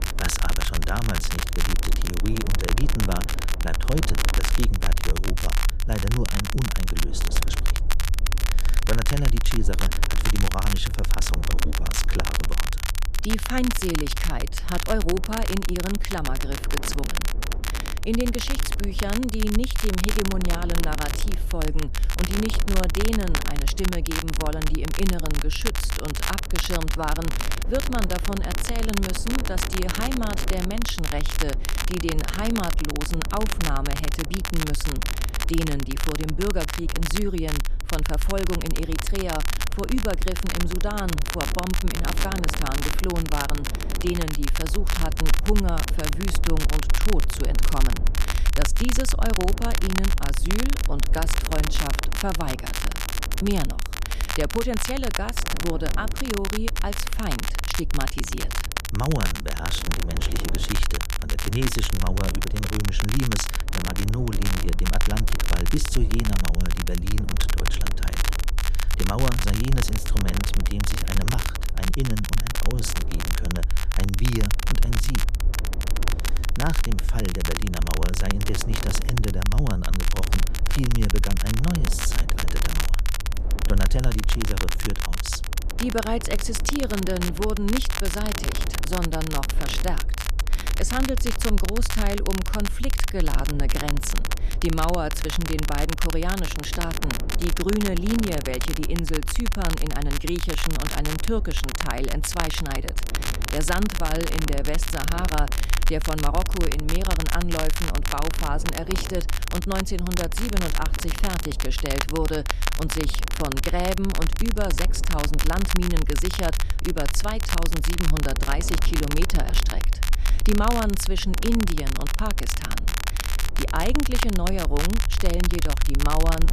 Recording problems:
crackle, like an old record; loud; 2 dB below the speech
wind noise on the microphone; occasional gusts; 15 dB below the speech
low rumble; faint; throughout; 20 dB below the speech

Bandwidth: 14.5 kHz